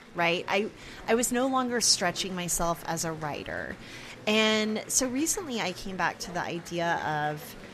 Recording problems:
murmuring crowd; noticeable; throughout; 20 dB below the speech

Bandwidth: 13.5 kHz